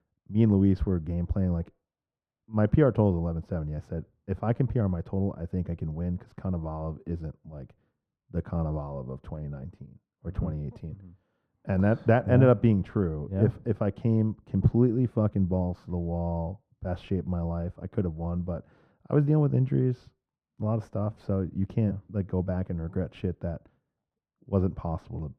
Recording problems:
muffled; very; fading above 2.5 kHz

